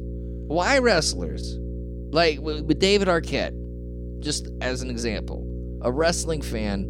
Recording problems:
electrical hum; noticeable; throughout; 60 Hz, 20 dB below the speech

